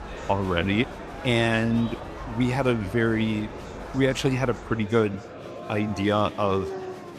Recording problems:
animal sounds; noticeable; throughout; 15 dB below the speech
murmuring crowd; noticeable; throughout; 15 dB below the speech

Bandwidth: 14.5 kHz